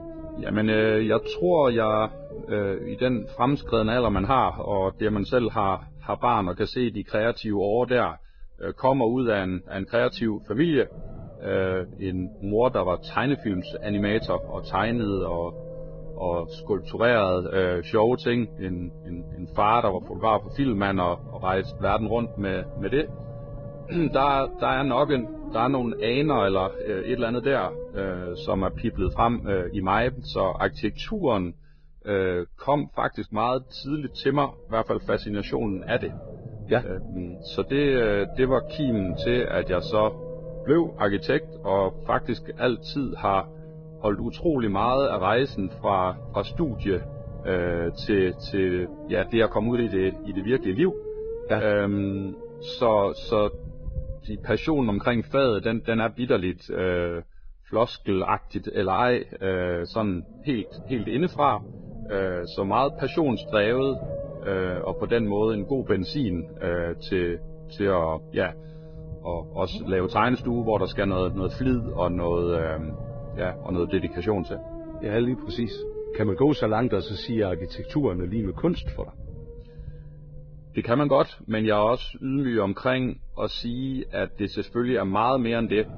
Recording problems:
garbled, watery; badly
muffled; very slightly; fading above 4.5 kHz
low rumble; noticeable; throughout; 15 dB below the speech

